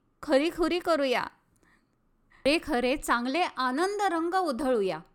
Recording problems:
none

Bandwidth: 17.5 kHz